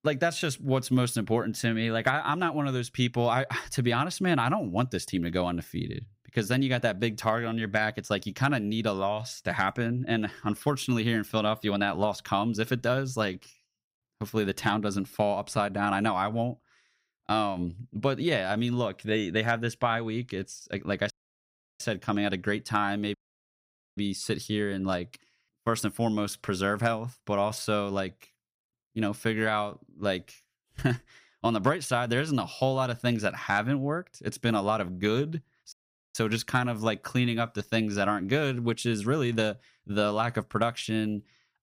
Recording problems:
audio cutting out; at 21 s for 0.5 s, at 23 s for 1 s and at 36 s

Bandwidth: 15.5 kHz